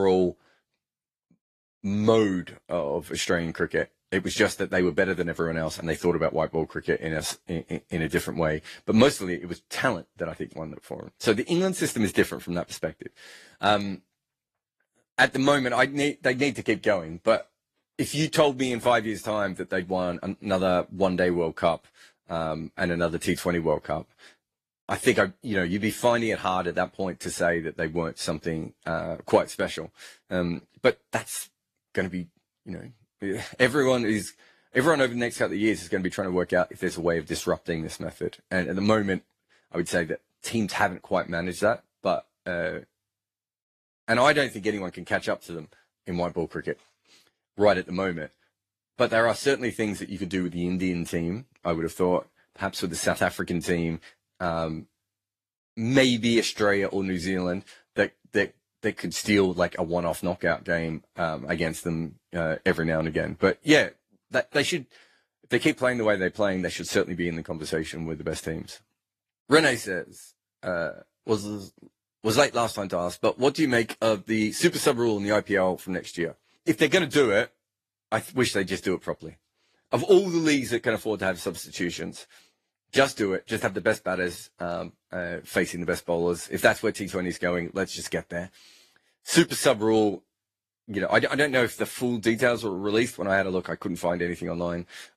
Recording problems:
garbled, watery; slightly; nothing above 14 kHz
abrupt cut into speech; at the start

